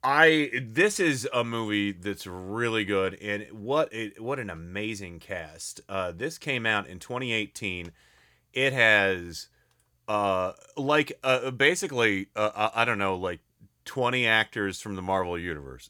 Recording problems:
none

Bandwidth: 18.5 kHz